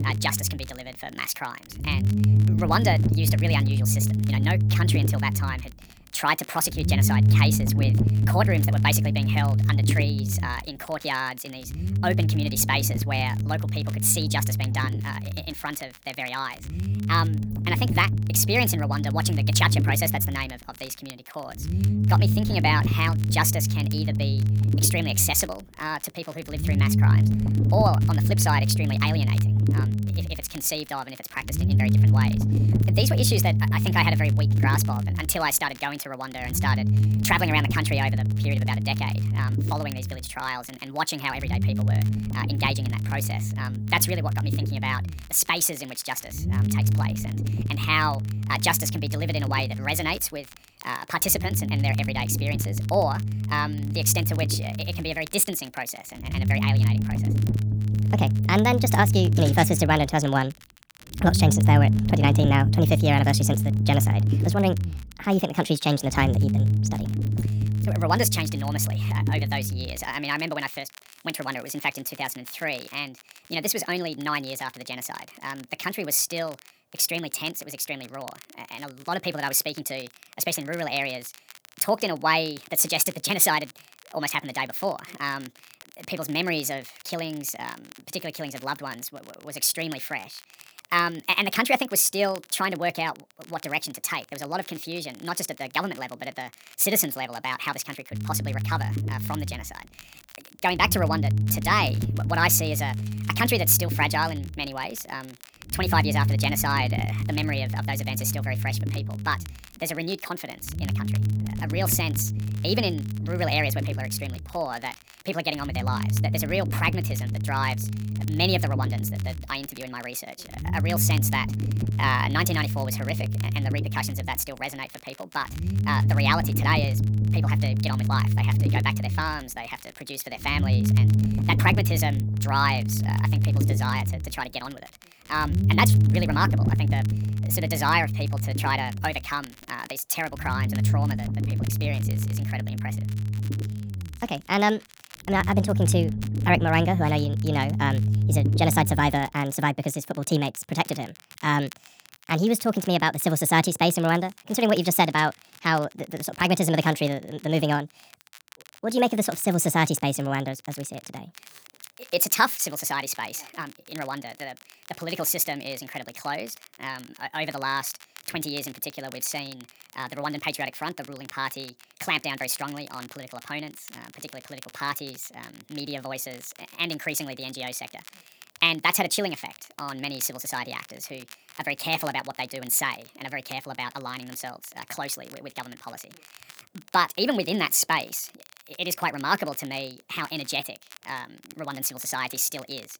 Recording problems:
wrong speed and pitch; too fast and too high; 1.5 times normal speed
low rumble; loud; until 1:10 and from 1:38 to 2:29; 10 dB below the speech
crackle, like an old record; faint; 20 dB below the speech

